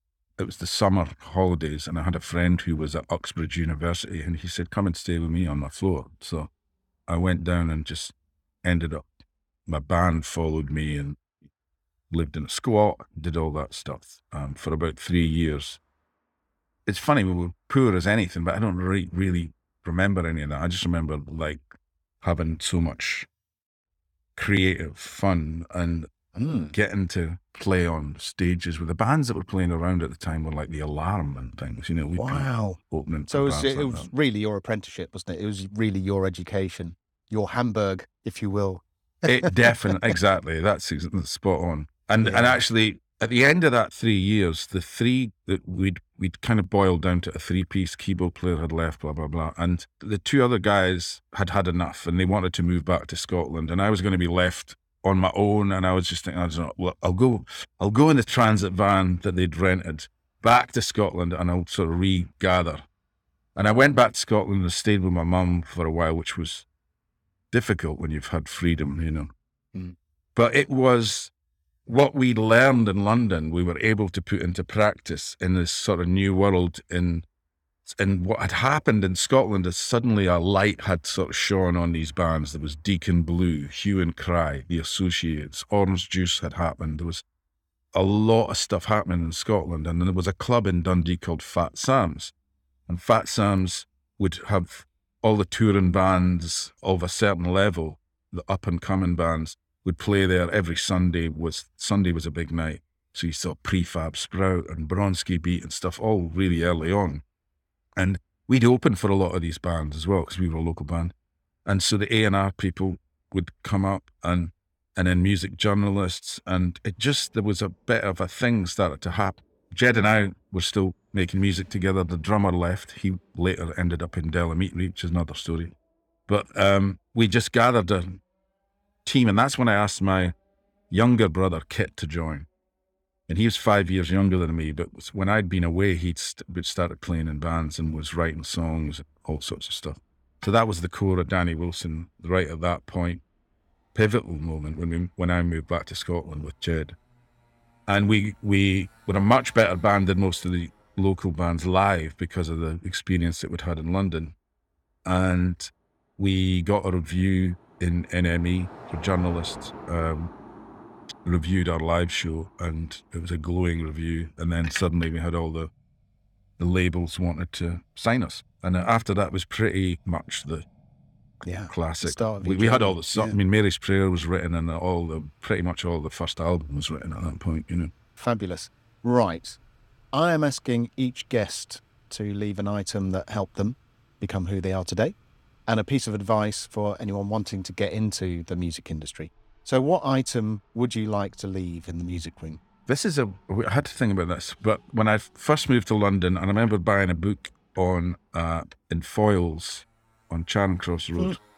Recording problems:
traffic noise; faint; throughout; 30 dB below the speech

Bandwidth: 18.5 kHz